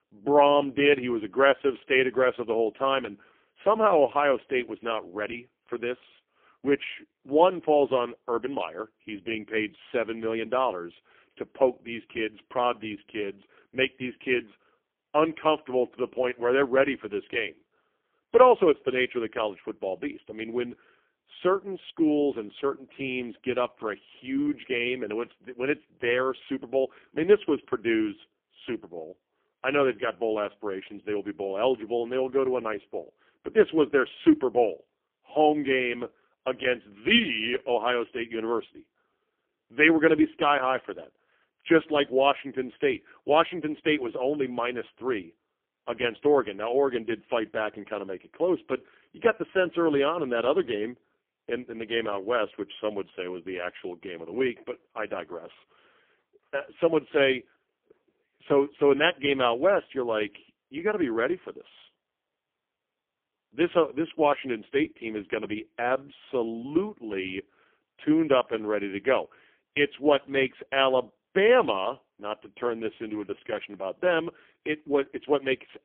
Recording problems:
phone-call audio; poor line; nothing above 3.5 kHz

